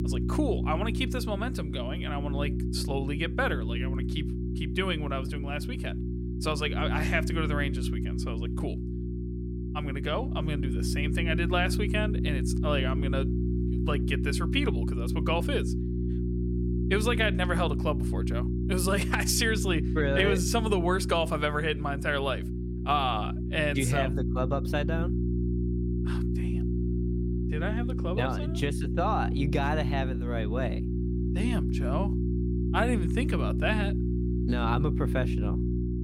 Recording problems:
electrical hum; loud; throughout; 60 Hz, 8 dB below the speech

